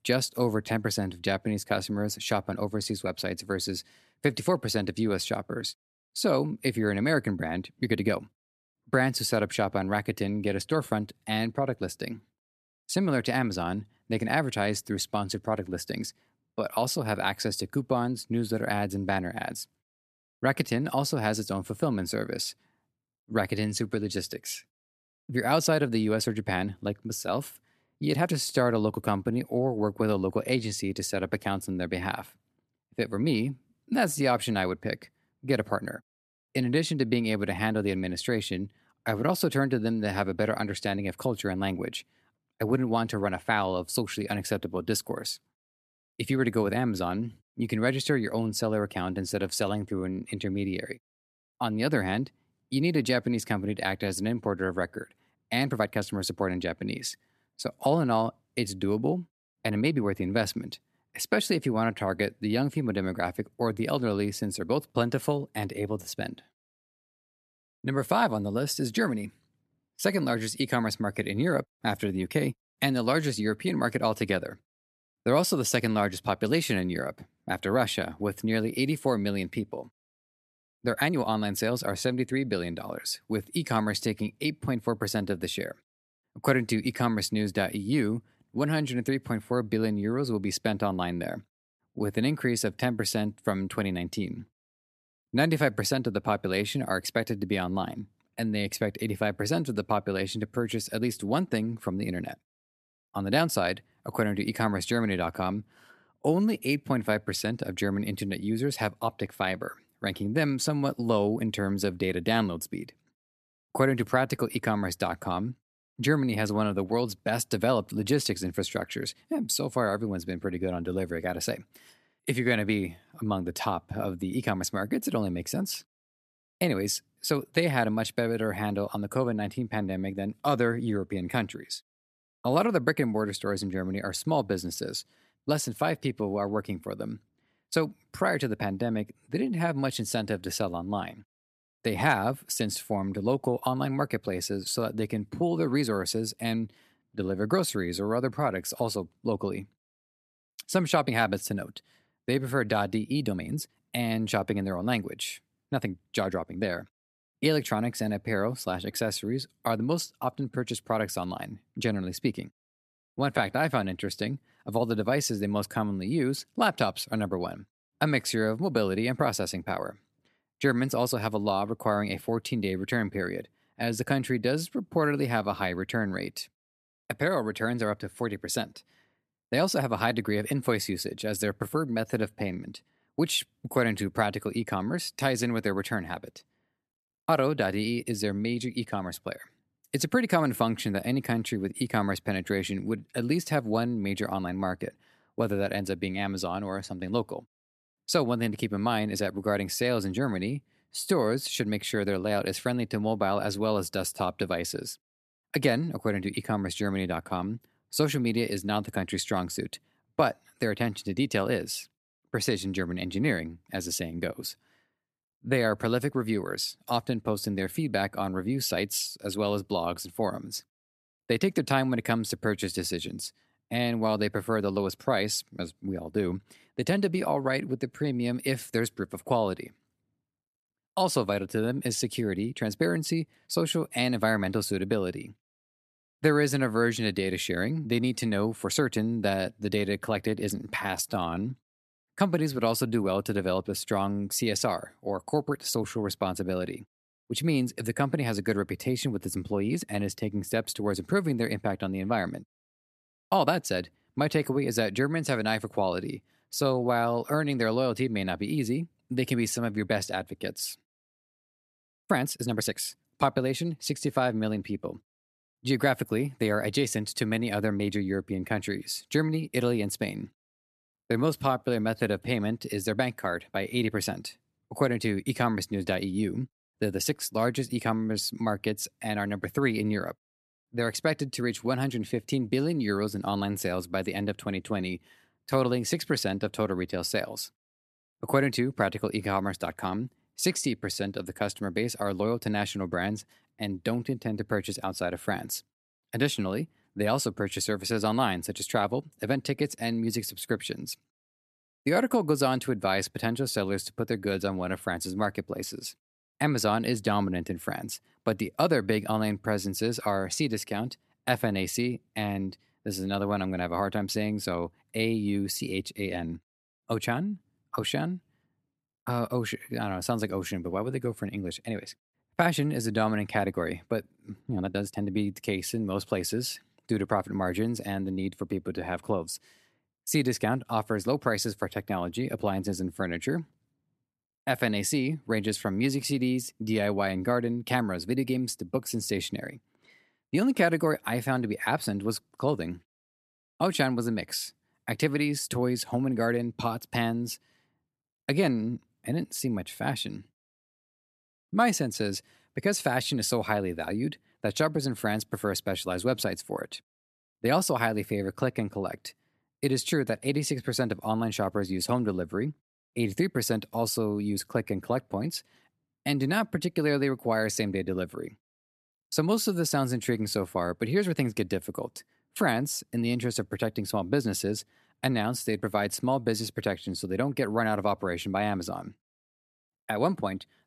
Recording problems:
uneven, jittery; strongly; from 8 s to 5:36

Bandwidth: 14 kHz